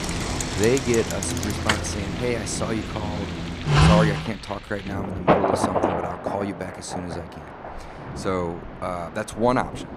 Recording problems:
traffic noise; very loud; until 4 s; 3 dB above the speech
rain or running water; loud; throughout; 3 dB below the speech

